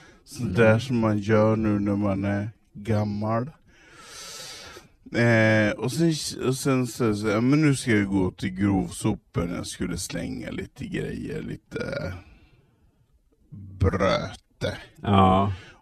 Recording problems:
wrong speed, natural pitch; too slow; 0.6 times normal speed

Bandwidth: 13.5 kHz